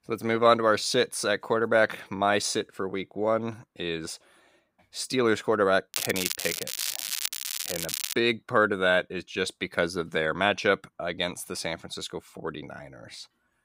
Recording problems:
crackling; loud; from 6 to 8 s; 4 dB below the speech

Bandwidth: 15.5 kHz